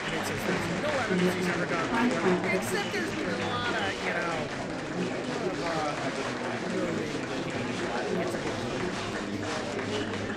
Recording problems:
murmuring crowd; very loud; throughout; 5 dB above the speech

